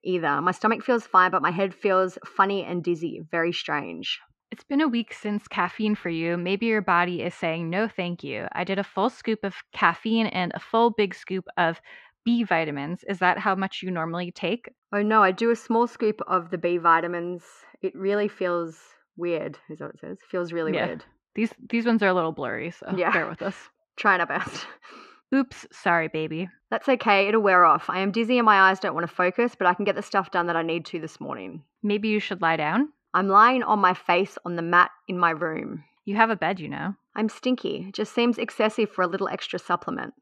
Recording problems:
muffled; slightly; fading above 2.5 kHz

